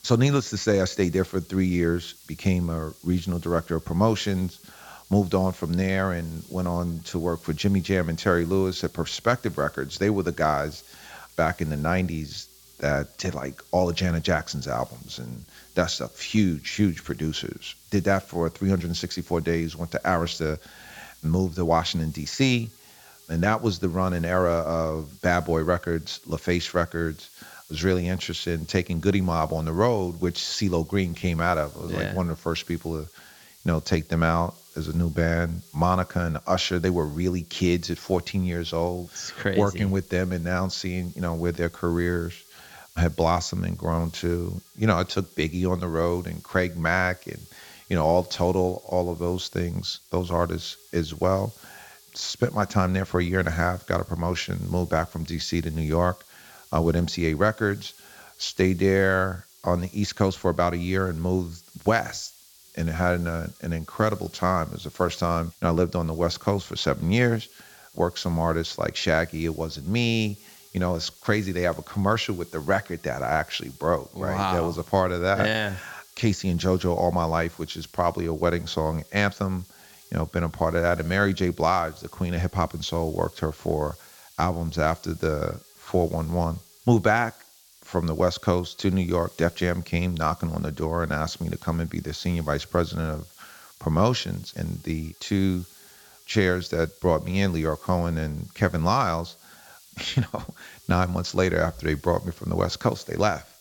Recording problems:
high frequencies cut off; noticeable; nothing above 8 kHz
hiss; faint; throughout; 25 dB below the speech

